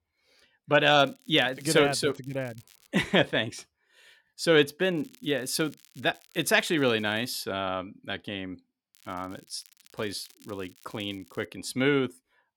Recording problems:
crackling; faint; from 1 to 3 s, from 5 to 7.5 s and from 9 to 11 s; 30 dB below the speech

